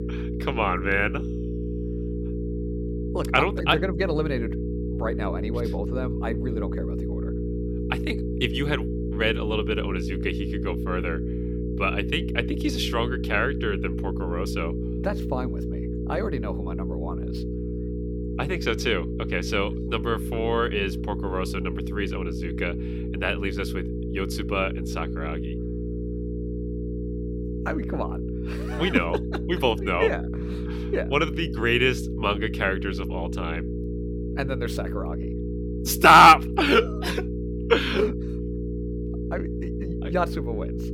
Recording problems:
electrical hum; noticeable; throughout; 60 Hz, 10 dB below the speech

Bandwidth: 17 kHz